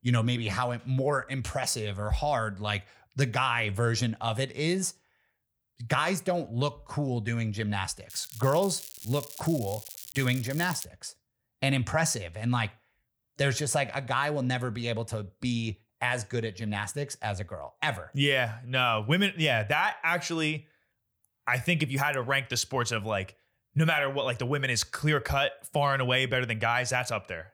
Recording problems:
crackling; noticeable; from 8 to 11 s; 15 dB below the speech

